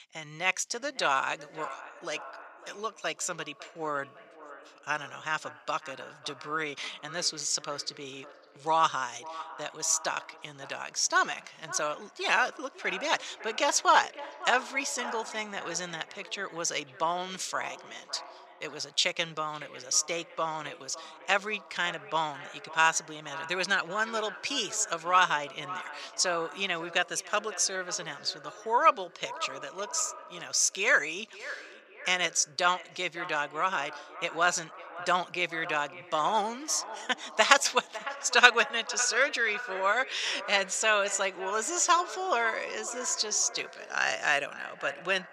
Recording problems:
thin; very; fading below 550 Hz
echo of what is said; noticeable; throughout; 550 ms later, 15 dB below the speech

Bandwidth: 14.5 kHz